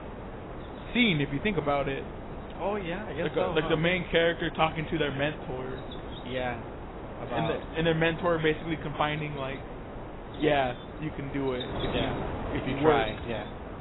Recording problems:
garbled, watery; badly; nothing above 3.5 kHz
animal sounds; noticeable; throughout; 20 dB below the speech
wind noise on the microphone; occasional gusts; 10 dB below the speech

